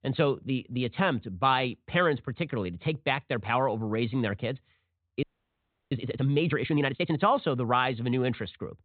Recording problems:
high frequencies cut off; severe; nothing above 4 kHz
audio freezing; at 5 s for 0.5 s

